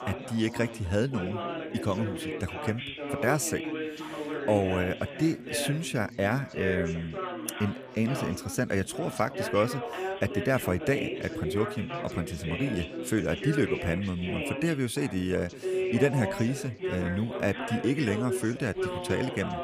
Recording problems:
background chatter; loud; throughout; 4 voices, 5 dB below the speech

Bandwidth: 15 kHz